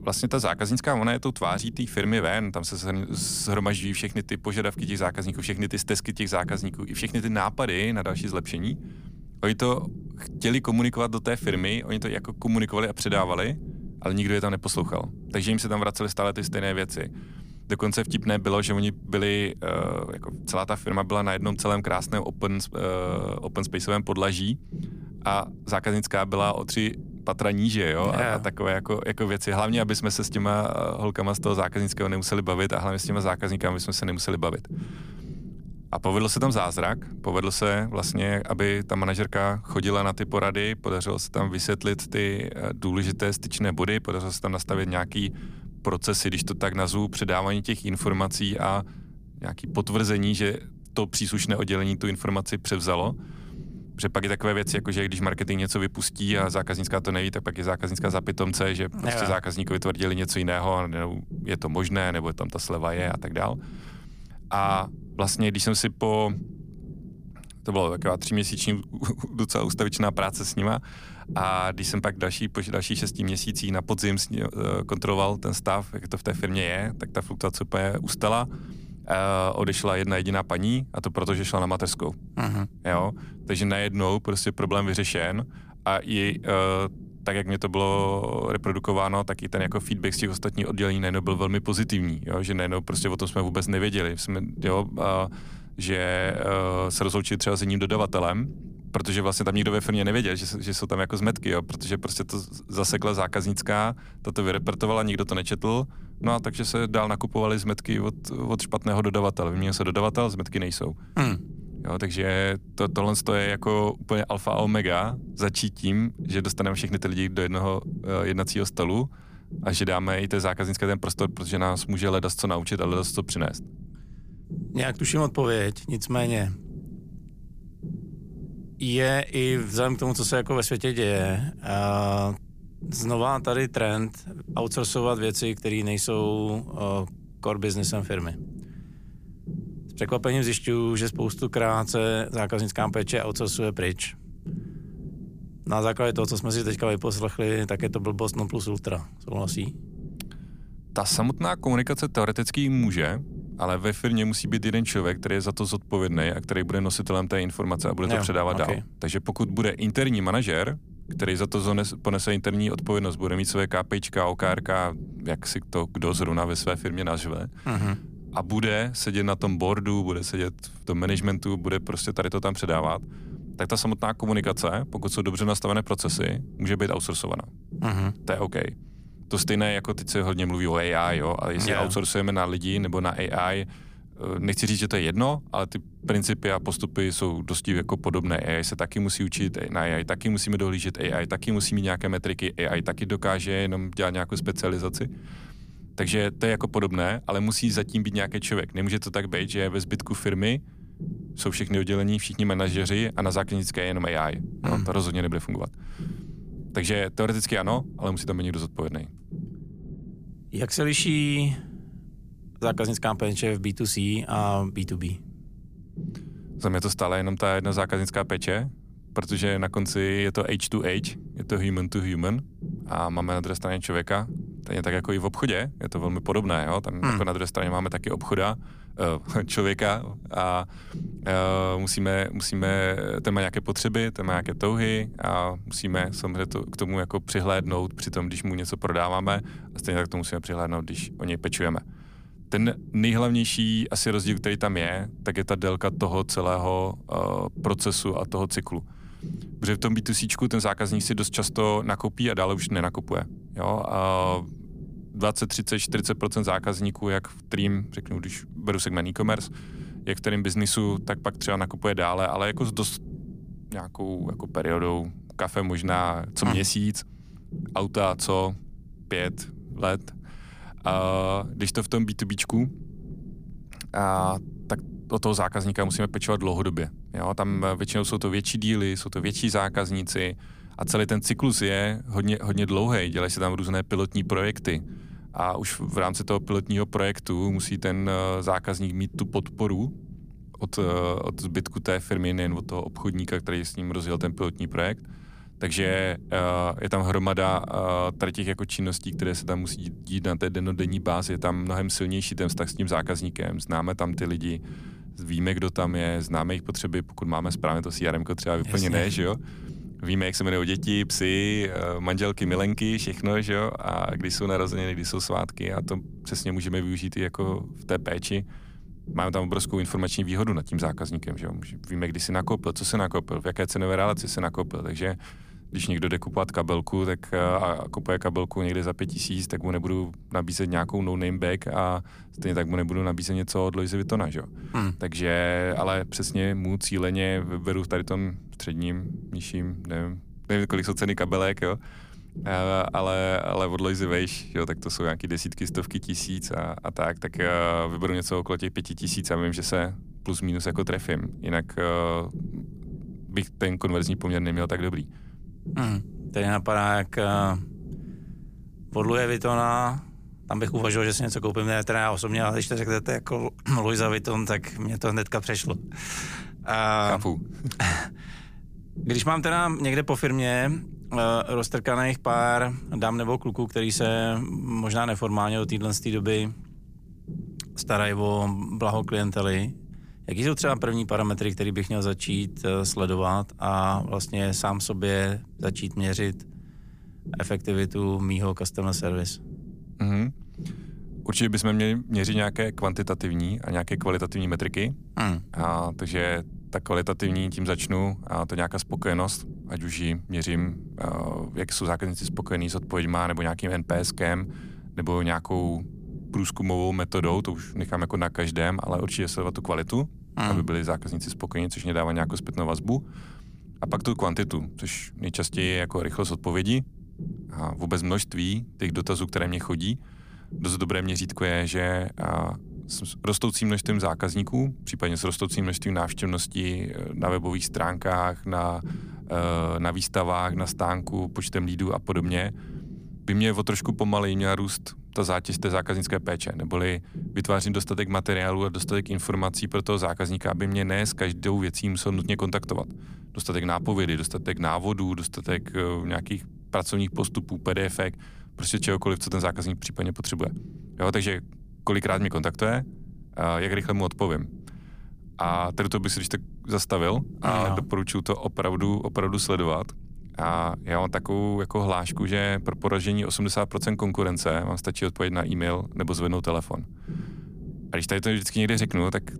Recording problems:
low rumble; faint; throughout; 20 dB below the speech

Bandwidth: 15 kHz